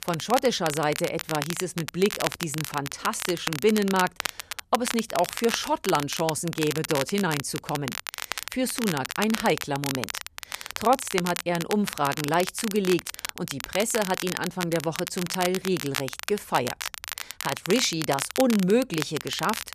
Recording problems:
crackle, like an old record; loud; 6 dB below the speech

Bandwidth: 14.5 kHz